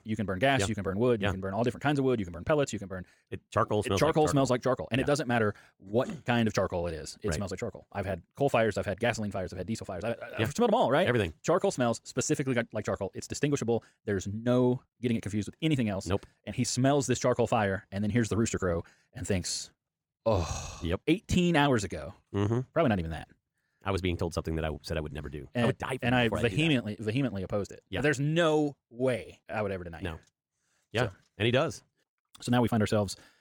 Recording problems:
wrong speed, natural pitch; too fast; 1.5 times normal speed

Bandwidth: 18.5 kHz